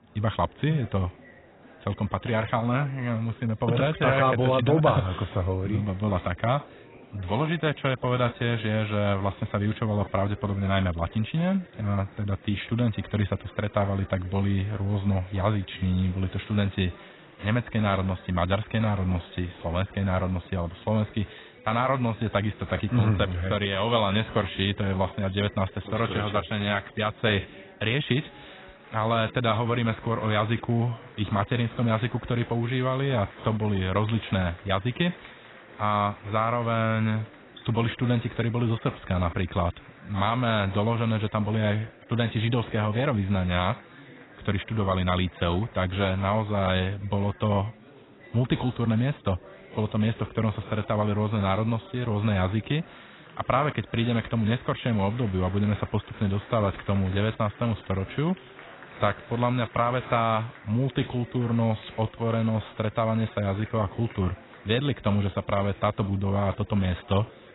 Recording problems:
garbled, watery; badly; nothing above 4 kHz
murmuring crowd; faint; throughout; 20 dB below the speech

